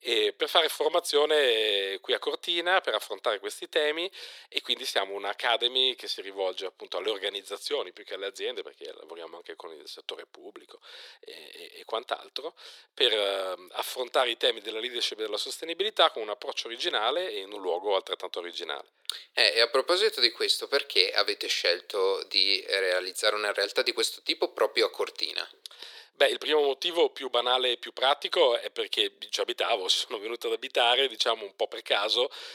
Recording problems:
thin; very; fading below 400 Hz

